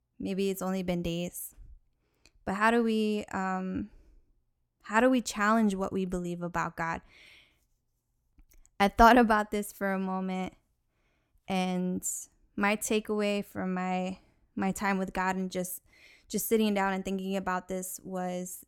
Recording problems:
none

